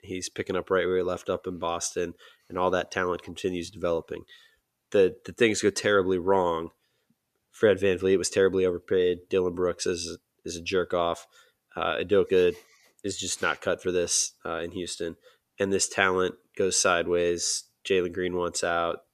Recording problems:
none

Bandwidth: 14.5 kHz